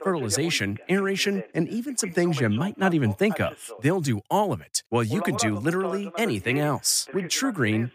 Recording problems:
voice in the background; noticeable; throughout; 15 dB below the speech

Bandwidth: 15 kHz